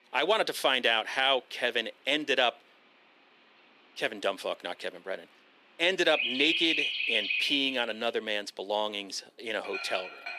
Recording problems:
thin; somewhat; fading below 300 Hz
animal sounds; loud; throughout; 1 dB below the speech

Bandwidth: 14.5 kHz